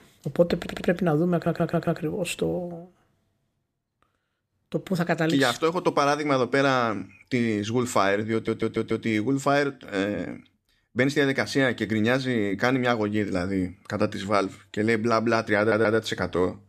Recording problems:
audio stuttering; 4 times, first at 0.5 s

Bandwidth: 14.5 kHz